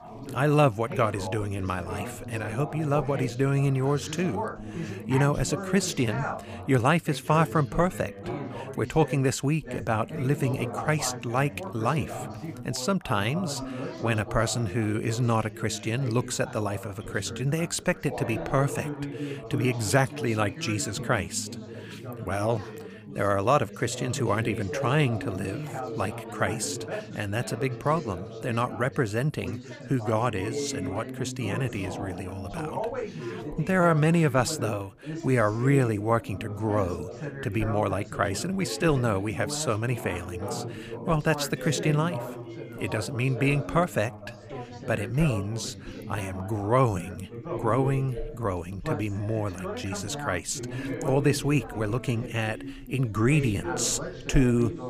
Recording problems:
background chatter; loud; throughout; 3 voices, 9 dB below the speech

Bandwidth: 15 kHz